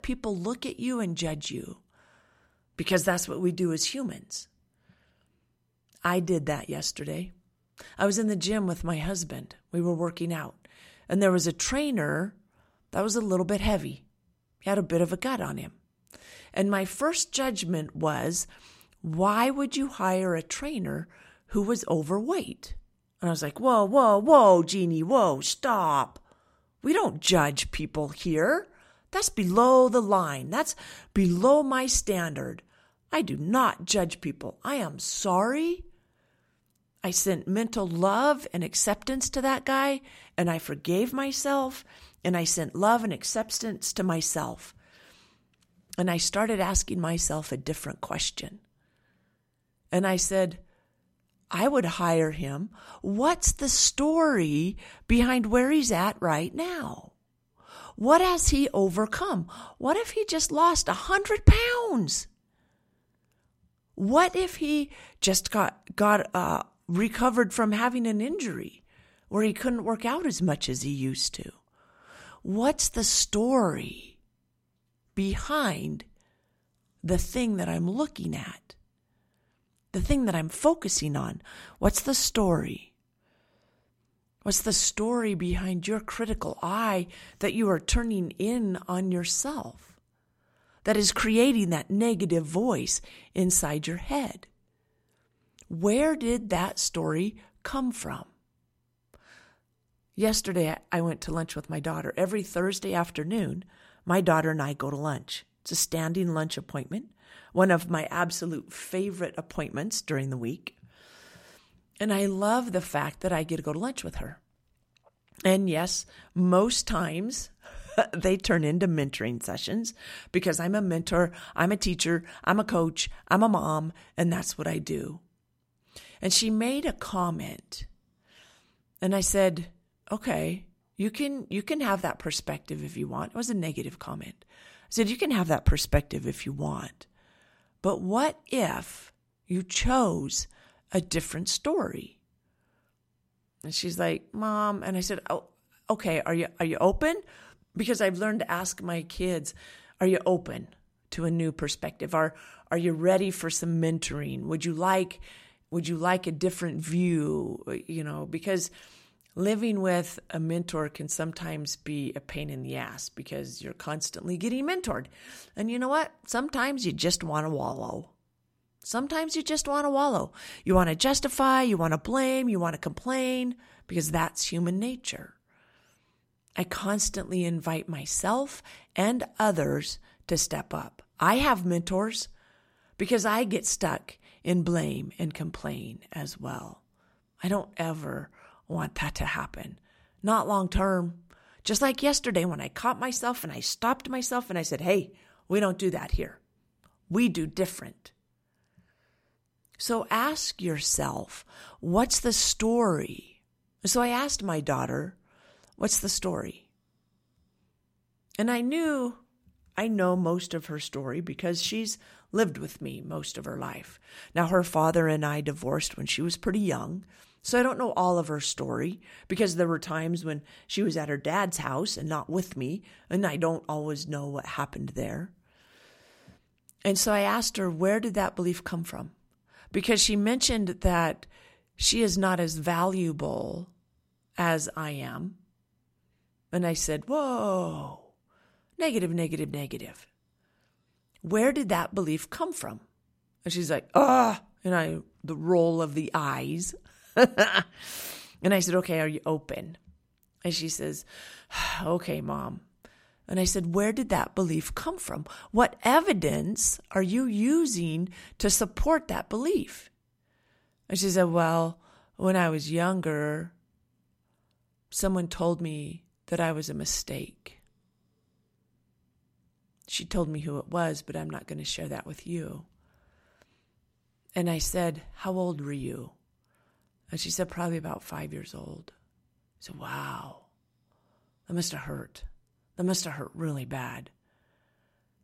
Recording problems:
none

